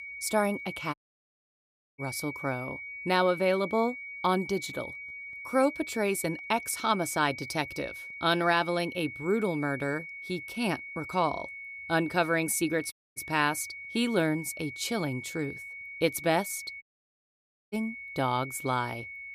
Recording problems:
high-pitched whine; loud; throughout; 2 kHz, 10 dB below the speech
audio cutting out; at 1 s for 1 s, at 13 s and at 17 s for 1 s

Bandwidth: 15 kHz